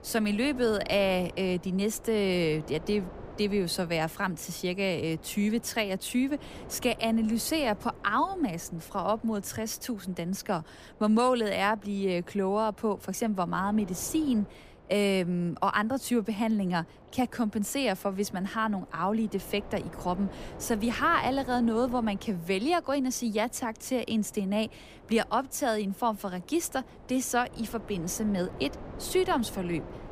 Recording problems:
wind noise on the microphone; occasional gusts; 20 dB below the speech

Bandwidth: 15 kHz